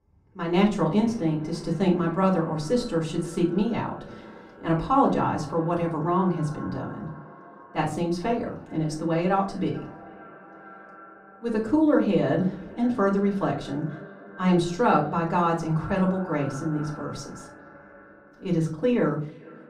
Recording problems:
off-mic speech; far
muffled; slightly; fading above 2 kHz
echo of what is said; faint; throughout; 440 ms later, 20 dB below the speech
room echo; very slight; dies away in 0.3 s

